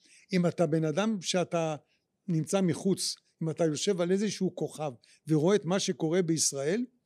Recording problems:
none

